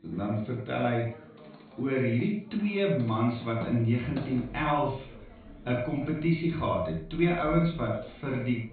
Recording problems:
echo of what is said; strong; throughout; 80 ms later, 8 dB below the speech
off-mic speech; far
high frequencies cut off; severe; nothing above 4.5 kHz
room echo; very slight; dies away in 0.3 s
household noises; noticeable; throughout; 20 dB below the speech
background chatter; faint; throughout; 2 voices, 20 dB below the speech

